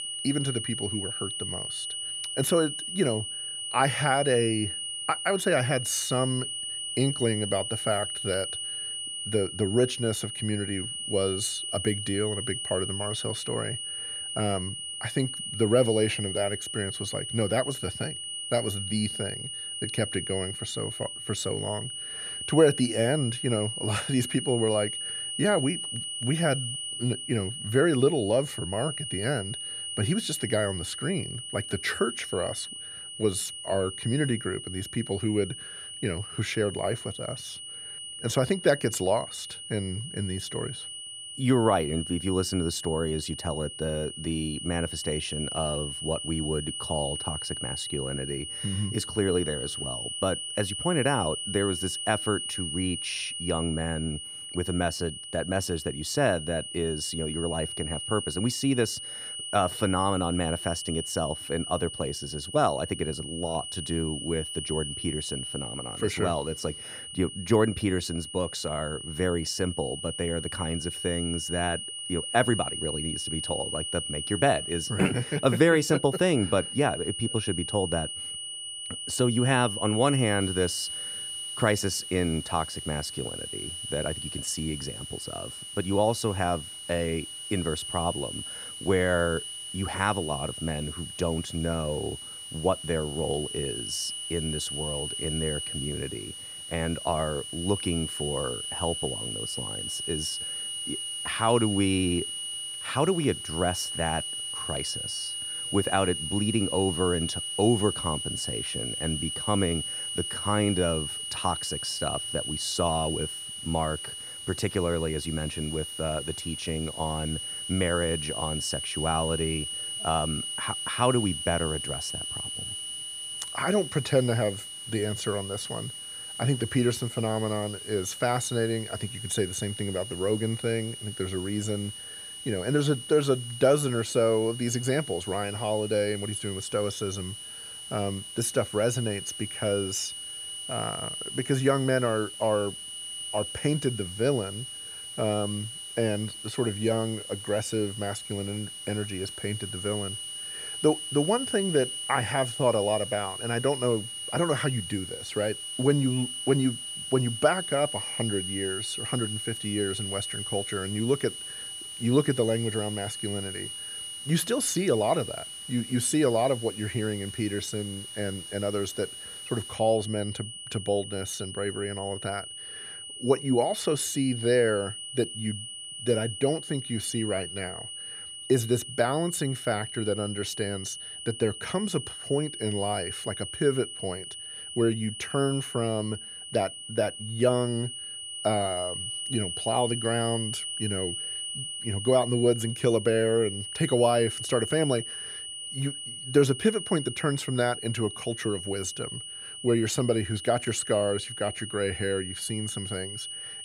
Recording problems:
high-pitched whine; loud; throughout; 3 kHz, 5 dB below the speech
hiss; faint; from 1:20 to 2:50; 25 dB below the speech

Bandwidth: 14.5 kHz